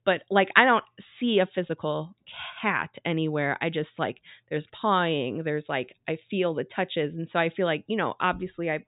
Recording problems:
high frequencies cut off; severe; nothing above 4 kHz

